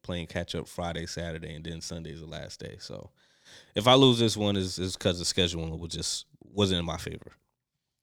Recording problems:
none

